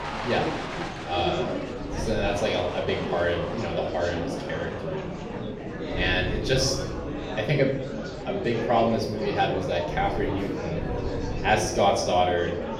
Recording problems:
off-mic speech; far
room echo; slight; dies away in 0.5 s
murmuring crowd; loud; throughout; 6 dB below the speech
wind noise on the microphone; occasional gusts; 25 dB below the speech

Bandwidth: 16 kHz